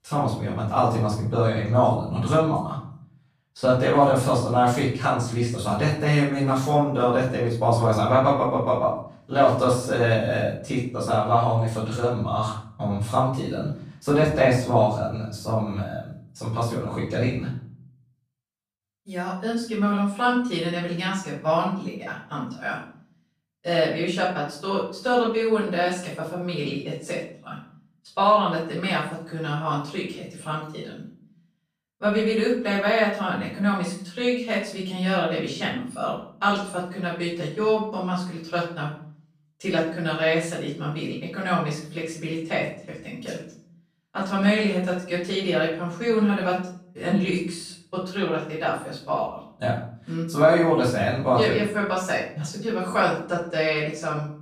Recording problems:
off-mic speech; far
room echo; noticeable; dies away in 0.5 s

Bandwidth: 14.5 kHz